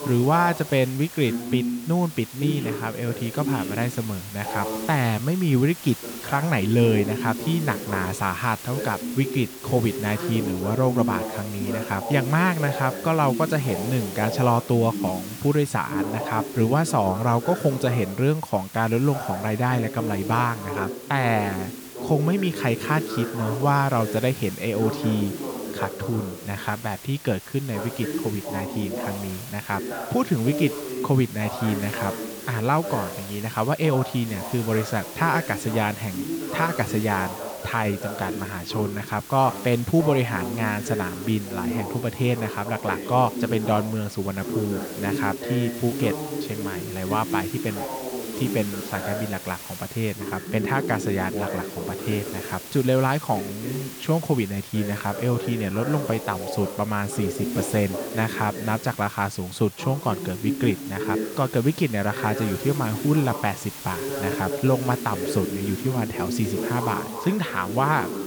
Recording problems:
voice in the background; loud; throughout; 7 dB below the speech
hiss; noticeable; throughout; 15 dB below the speech

